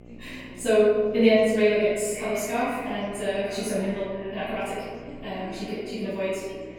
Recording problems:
room echo; strong; dies away in 1.2 s
off-mic speech; far
wrong speed, natural pitch; too fast; 1.6 times normal speed
echo of what is said; noticeable; throughout; 440 ms later, 15 dB below the speech
electrical hum; faint; throughout; 60 Hz, 25 dB below the speech
background chatter; faint; throughout; 4 voices, 20 dB below the speech

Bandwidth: 18 kHz